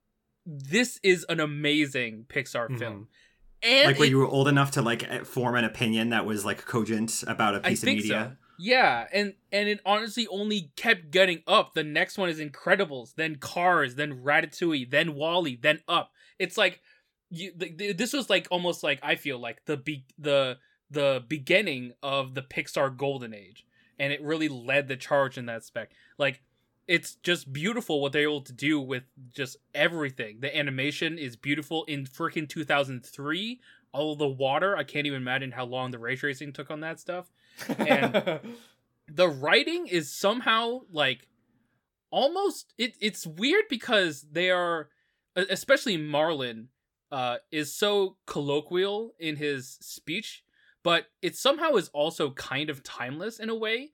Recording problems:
none

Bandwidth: 17.5 kHz